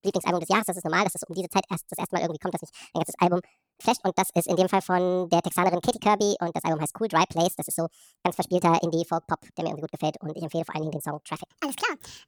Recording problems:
wrong speed and pitch; too fast and too high; 1.6 times normal speed

